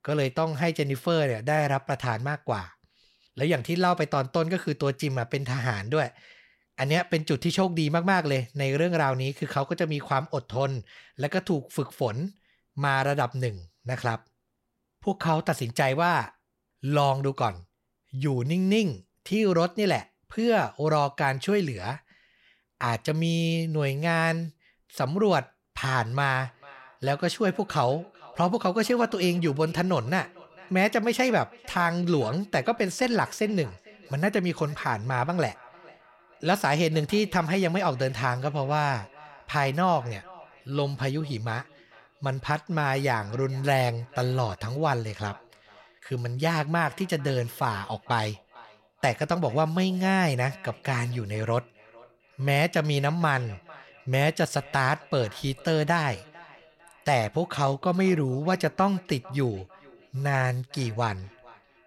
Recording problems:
echo of what is said; faint; from 26 s on; 450 ms later, 25 dB below the speech

